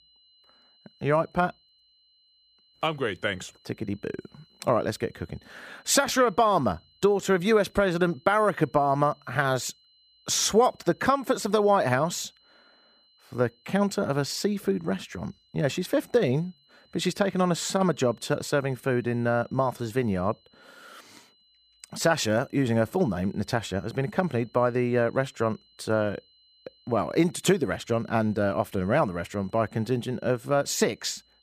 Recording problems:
high-pitched whine; faint; throughout; 4 kHz, 35 dB below the speech

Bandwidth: 15 kHz